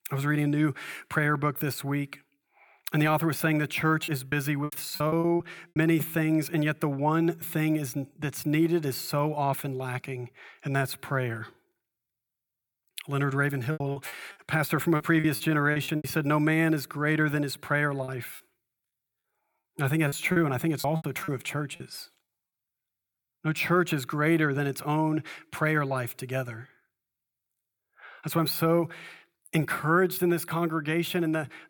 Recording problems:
choppy; very; from 4 to 6 s, from 14 to 16 s and from 18 to 22 s; 18% of the speech affected

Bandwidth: 18.5 kHz